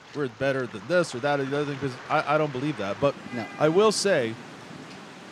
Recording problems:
rain or running water; noticeable; throughout; 15 dB below the speech

